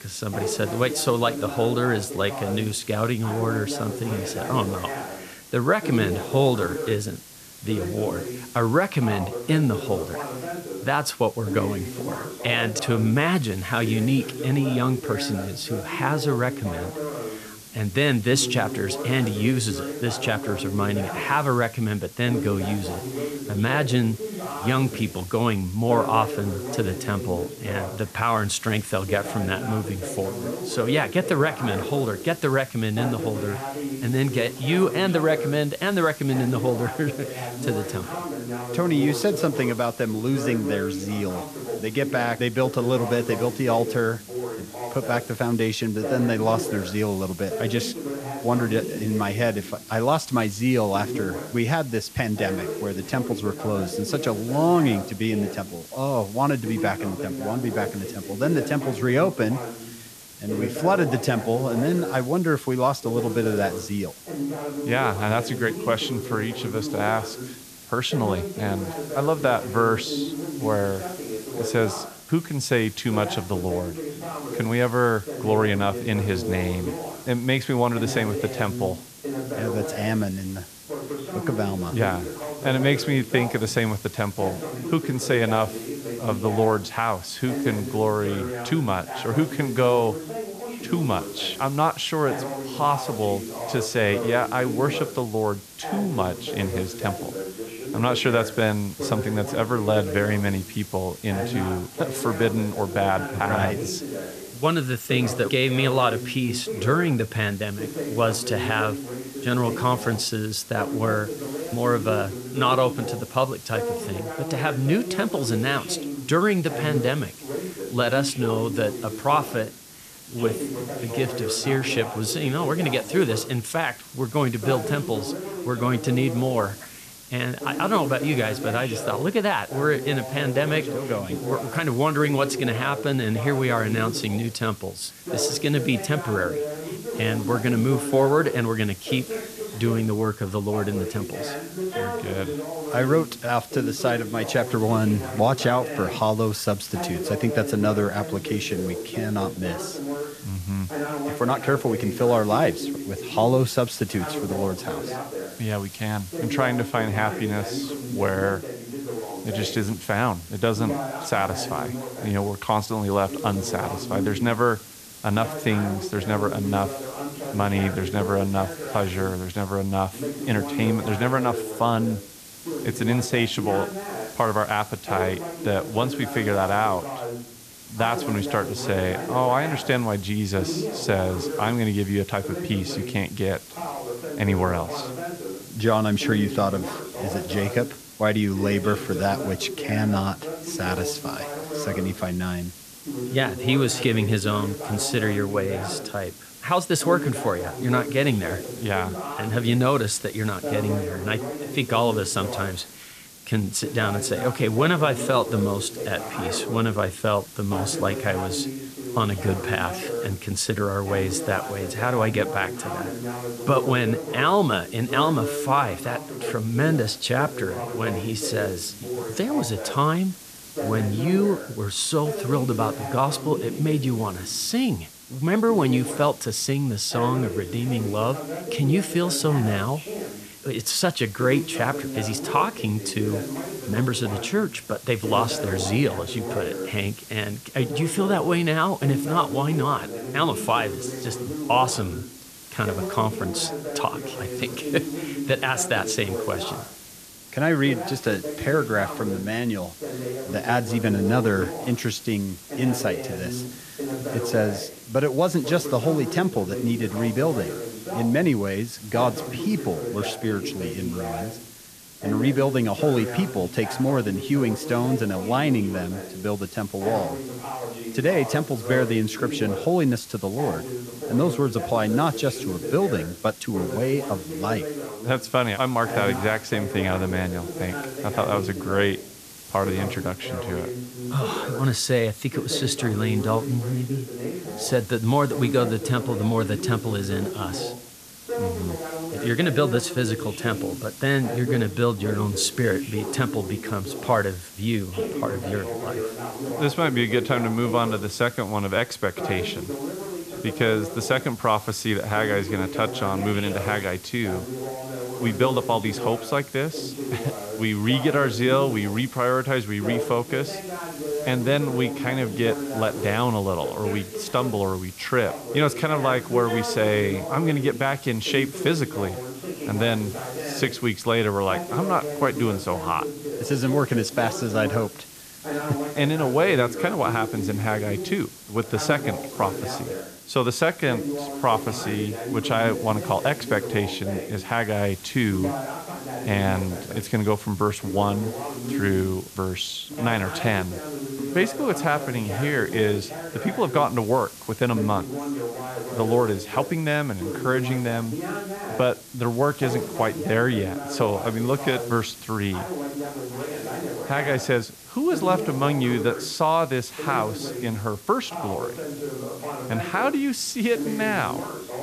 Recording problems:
voice in the background; loud; throughout; 8 dB below the speech
hiss; noticeable; throughout; 15 dB below the speech

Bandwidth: 14.5 kHz